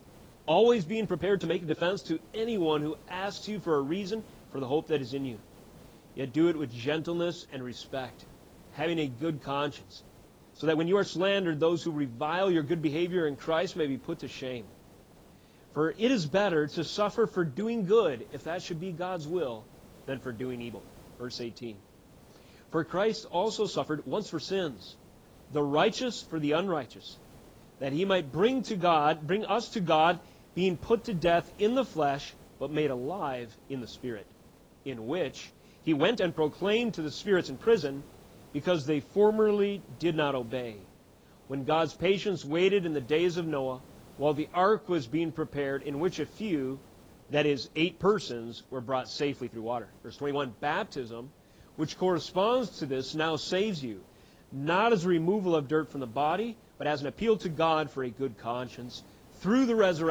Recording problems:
garbled, watery; badly; nothing above 7.5 kHz
hiss; faint; throughout; 25 dB below the speech
uneven, jittery; strongly; from 1 to 57 s
abrupt cut into speech; at the end

